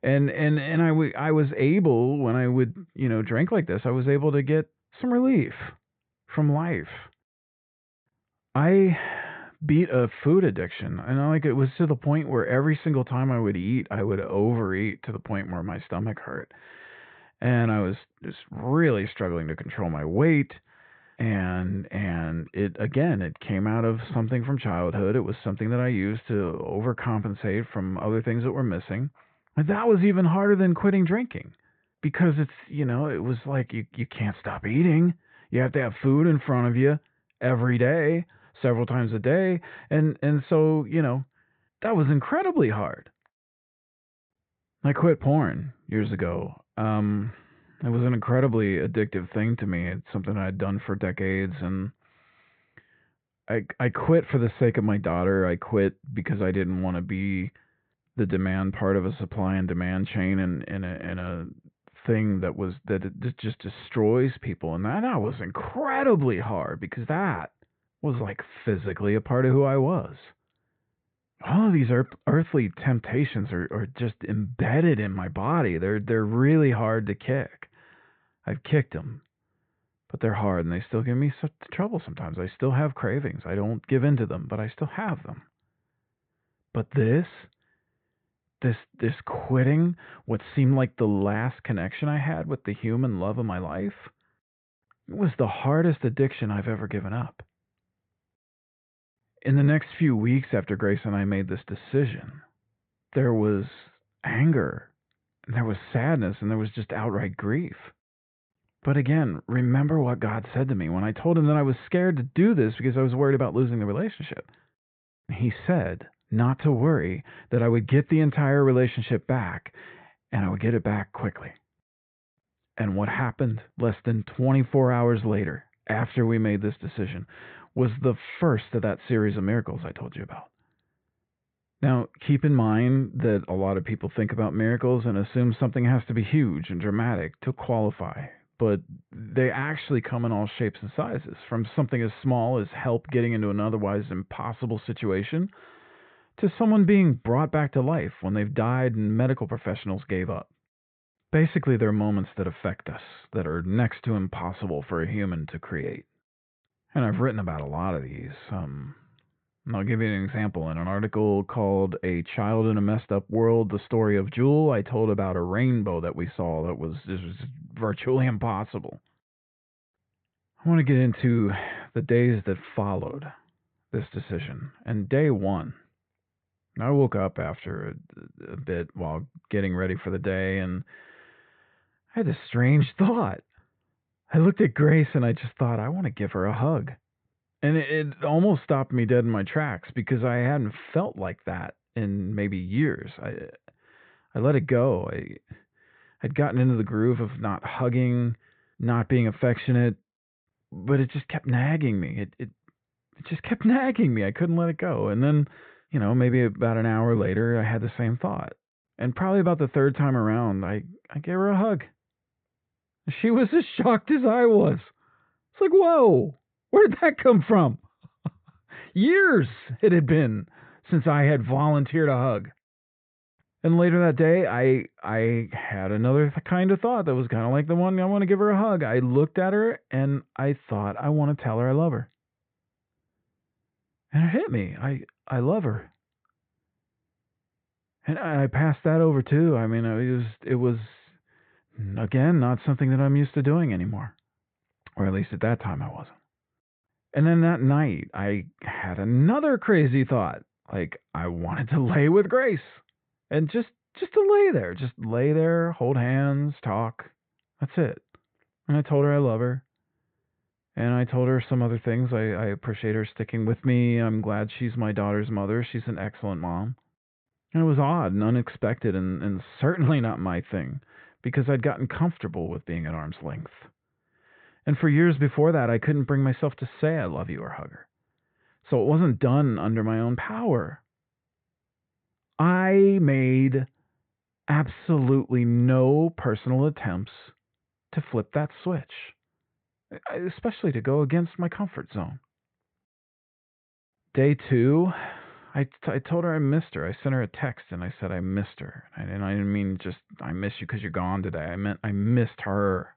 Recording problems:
high frequencies cut off; severe; nothing above 4 kHz

